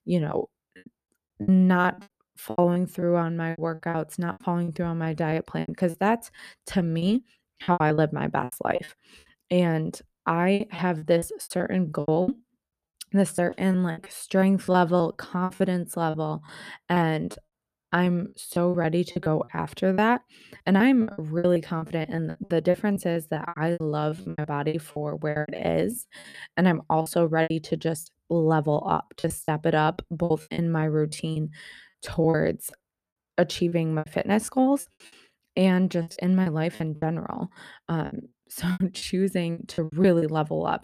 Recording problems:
choppy; very; 16% of the speech affected

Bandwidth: 14.5 kHz